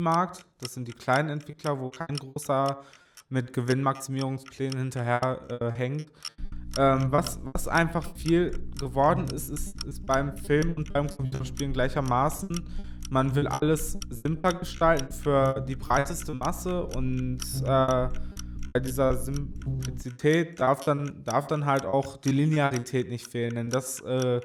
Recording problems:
echo of what is said; faint; throughout; 90 ms later, 20 dB below the speech
household noises; noticeable; throughout; 15 dB below the speech
electrical hum; faint; from 6.5 to 20 s; 60 Hz, 20 dB below the speech
choppy; very; 14% of the speech affected
abrupt cut into speech; at the start

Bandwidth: 19 kHz